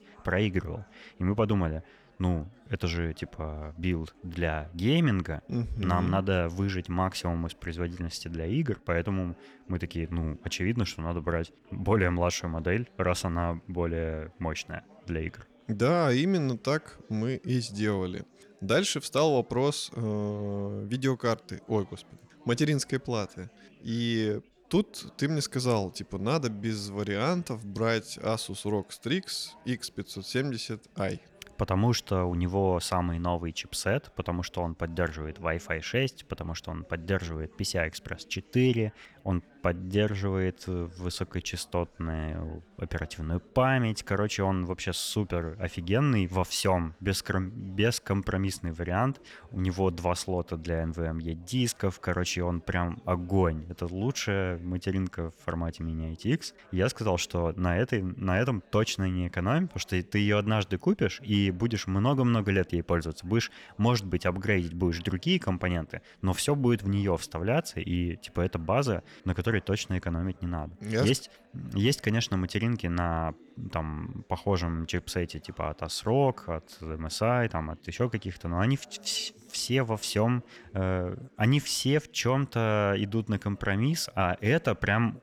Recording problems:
chatter from many people; faint; throughout; 30 dB below the speech

